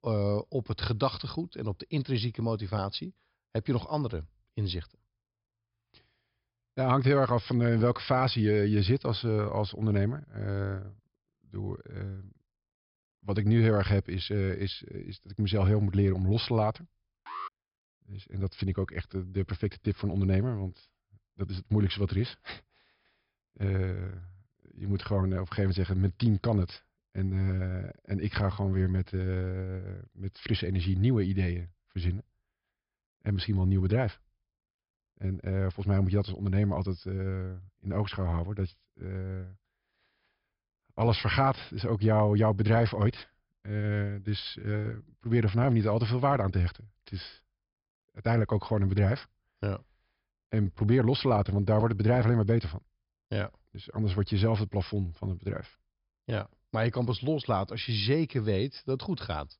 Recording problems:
high frequencies cut off; noticeable; nothing above 5.5 kHz
alarm; faint; at 17 s; peak 10 dB below the speech

